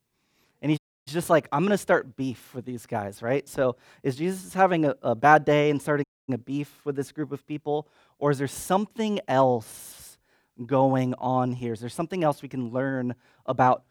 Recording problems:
audio cutting out; at 1 s and at 6 s

